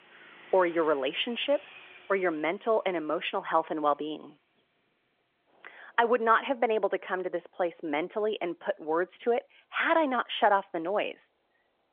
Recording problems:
phone-call audio; nothing above 3.5 kHz
traffic noise; faint; throughout; 25 dB below the speech

